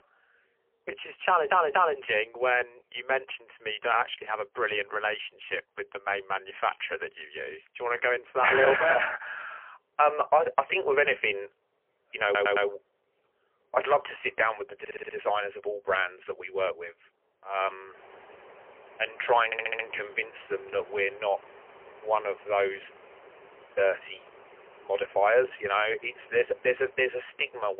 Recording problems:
phone-call audio; poor line; nothing above 3 kHz
animal sounds; faint; throughout; 25 dB below the speech
audio stuttering; 4 times, first at 1.5 s
abrupt cut into speech; at the end

